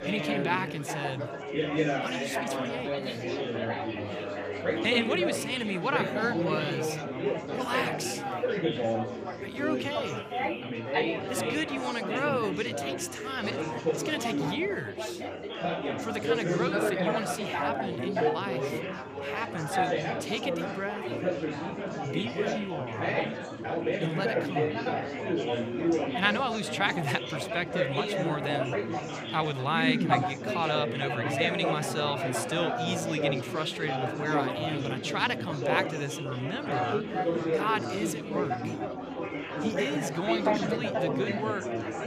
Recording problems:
chatter from many people; very loud; throughout; 1 dB above the speech

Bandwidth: 15 kHz